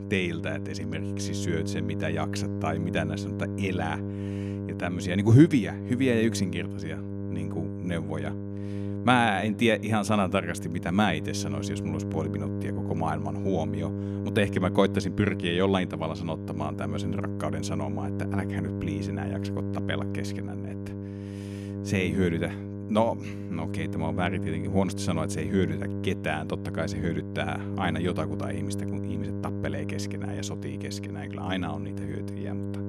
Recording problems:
electrical hum; loud; throughout; 50 Hz, 9 dB below the speech

